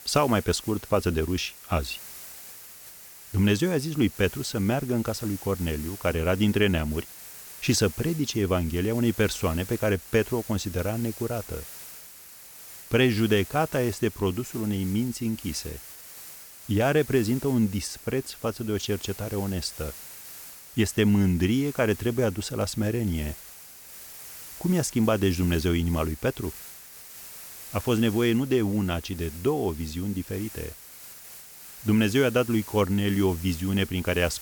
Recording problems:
hiss; noticeable; throughout; 15 dB below the speech

